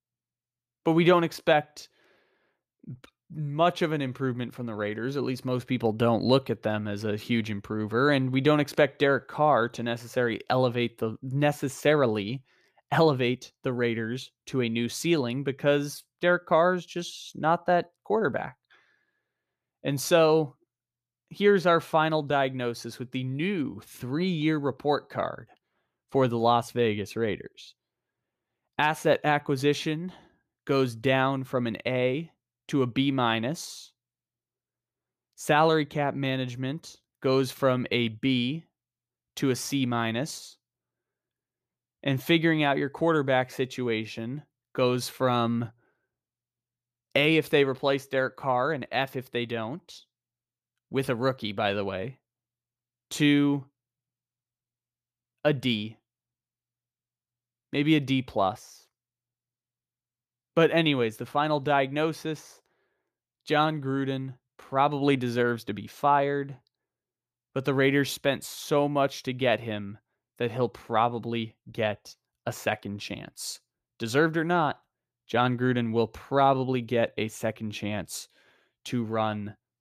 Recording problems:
none

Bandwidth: 14.5 kHz